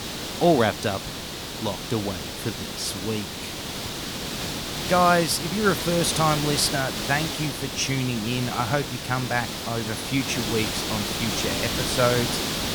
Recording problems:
hiss; loud; throughout; 3 dB below the speech

